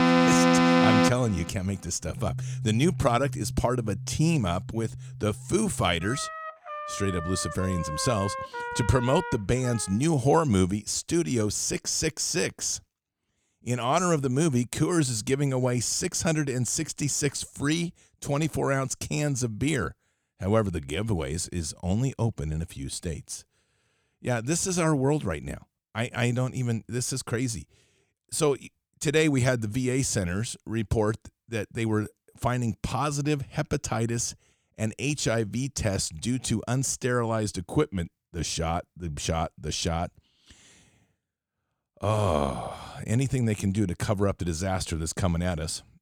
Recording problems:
background music; loud; until 10 s; as loud as the speech

